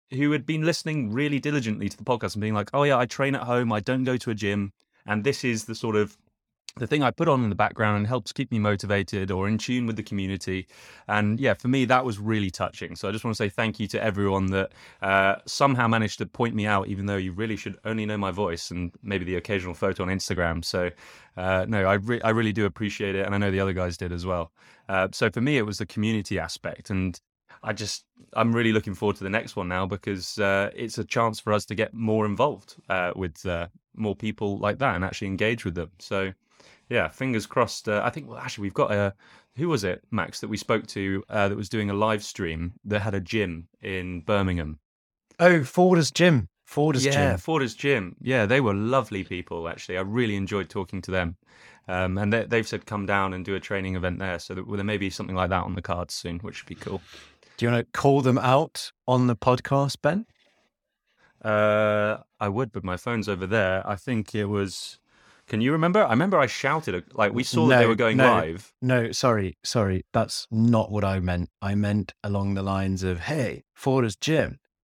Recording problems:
none

